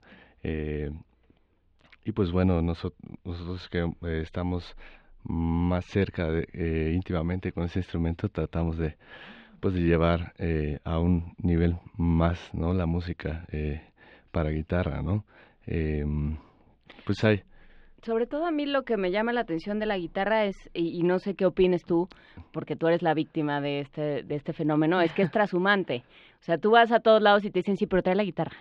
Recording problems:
muffled; slightly; fading above 3.5 kHz

